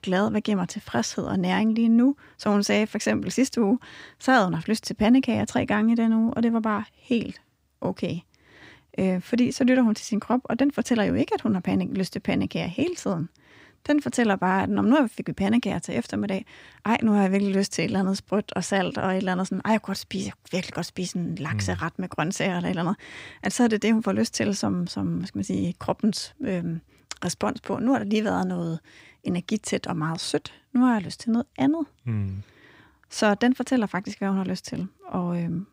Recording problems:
none

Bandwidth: 15.5 kHz